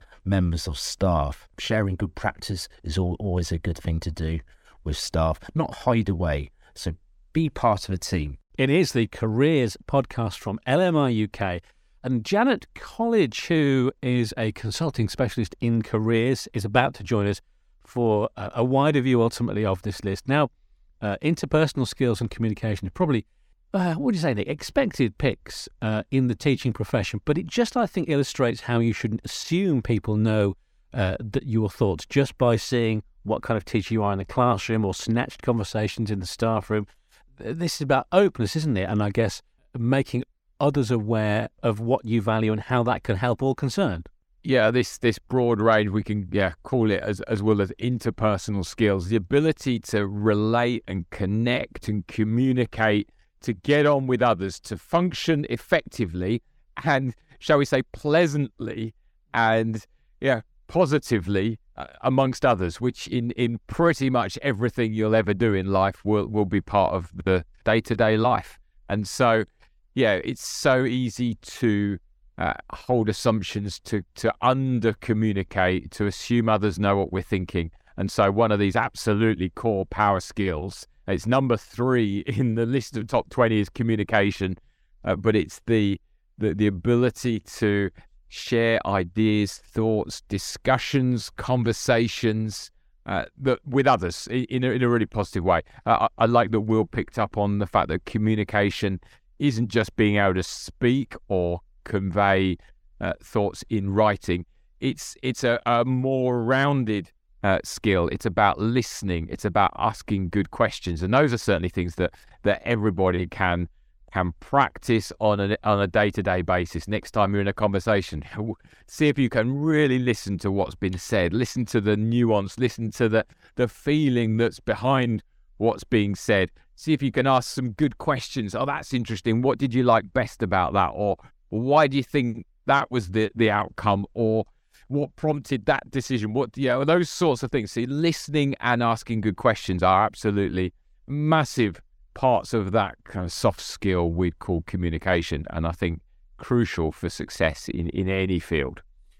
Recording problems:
none

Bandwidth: 17 kHz